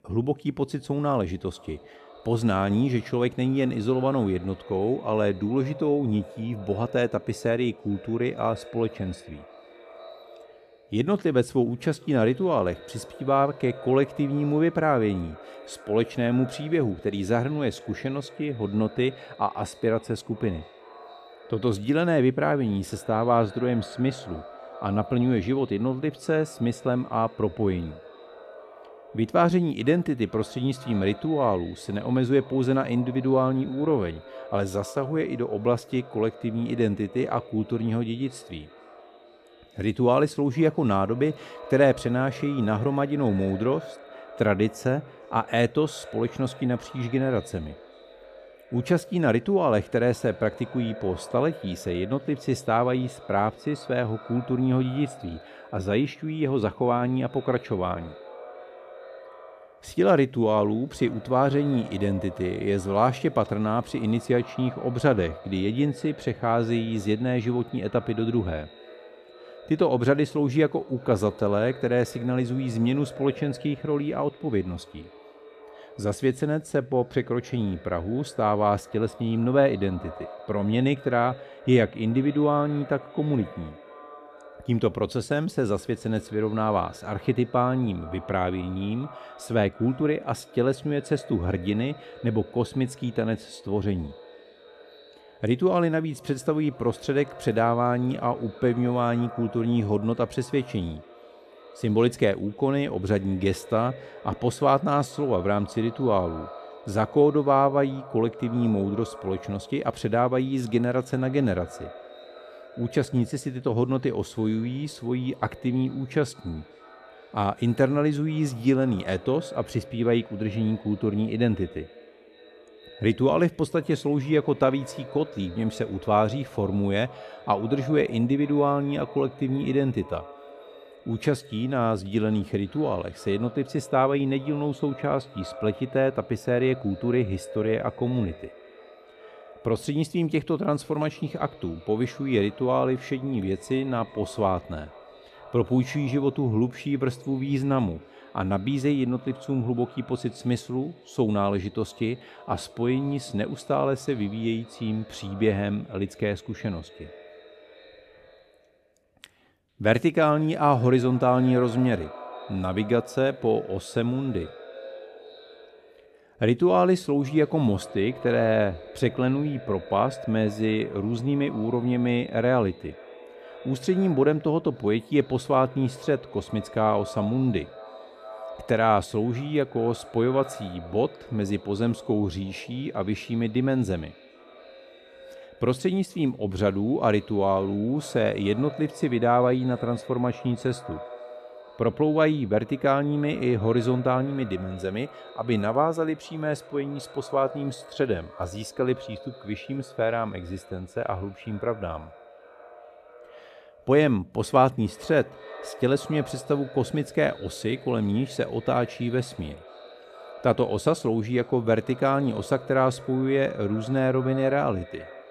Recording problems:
echo of what is said; faint; throughout; 450 ms later, 20 dB below the speech

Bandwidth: 14 kHz